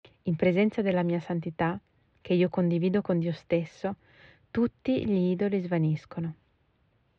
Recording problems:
muffled; slightly; fading above 3.5 kHz

